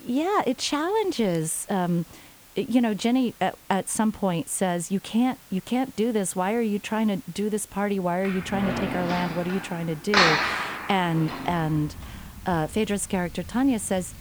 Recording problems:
household noises; loud; from 7.5 s on; 2 dB below the speech
hiss; faint; throughout; 20 dB below the speech

